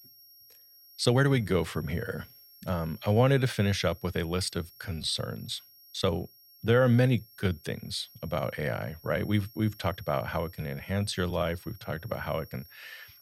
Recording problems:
high-pitched whine; faint; throughout; 11.5 kHz, 25 dB below the speech
uneven, jittery; strongly; from 1 to 13 s

